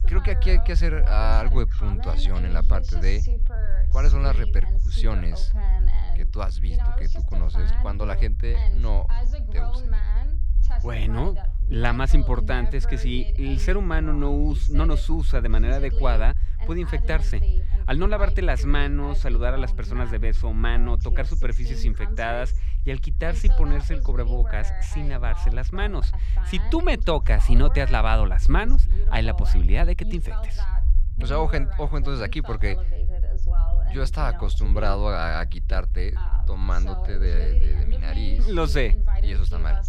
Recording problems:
voice in the background; noticeable; throughout; 15 dB below the speech
low rumble; noticeable; throughout; 20 dB below the speech

